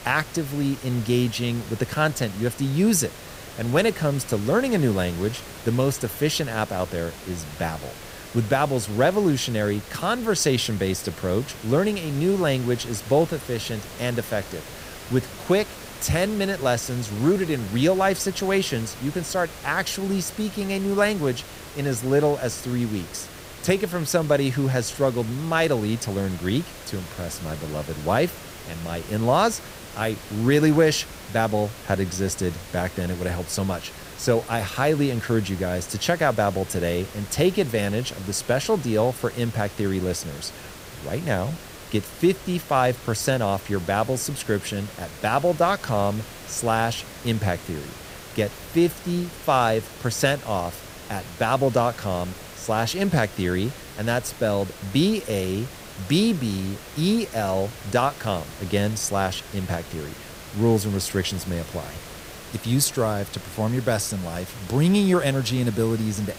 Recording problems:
hiss; noticeable; throughout; 15 dB below the speech

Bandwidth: 15.5 kHz